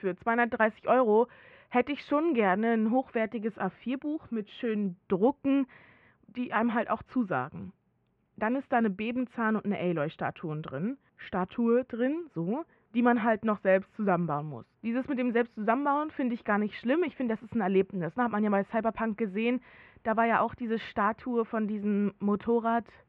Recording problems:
muffled; very; fading above 2.5 kHz

